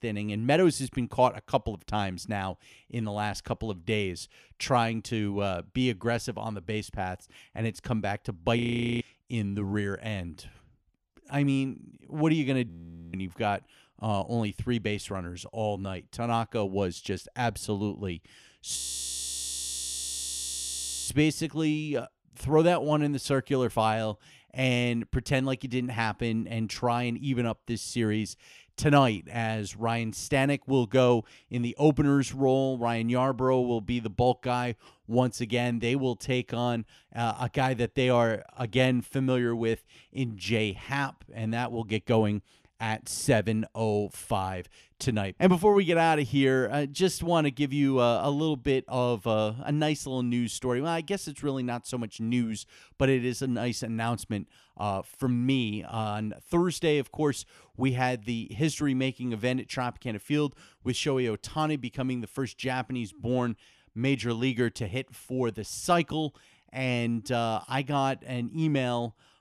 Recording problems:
audio freezing; at 8.5 s, at 13 s and at 19 s for 2.5 s

